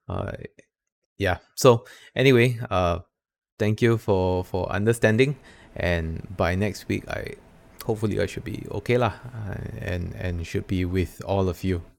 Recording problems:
none

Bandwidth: 17.5 kHz